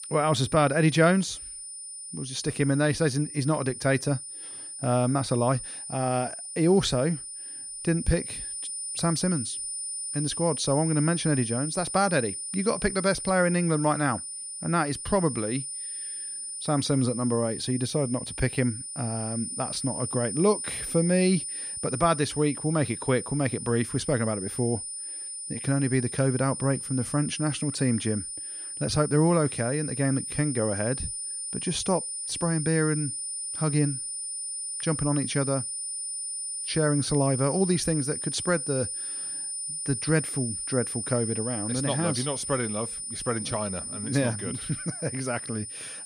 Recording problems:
high-pitched whine; loud; throughout; 9.5 kHz, 5 dB below the speech

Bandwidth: 15 kHz